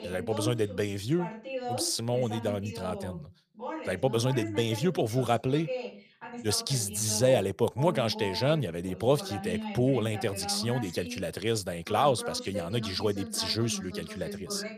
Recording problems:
voice in the background; loud; throughout; 10 dB below the speech

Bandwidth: 15 kHz